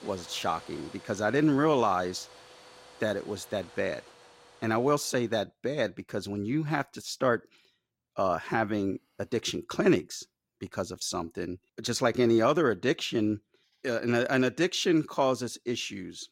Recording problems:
household noises; faint; until 5 s; 20 dB below the speech

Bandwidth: 16 kHz